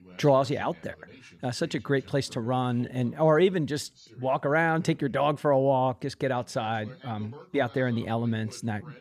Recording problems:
voice in the background; faint; throughout; 25 dB below the speech

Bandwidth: 14.5 kHz